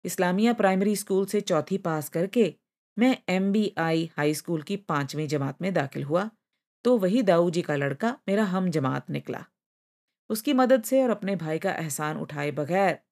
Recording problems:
none

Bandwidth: 14.5 kHz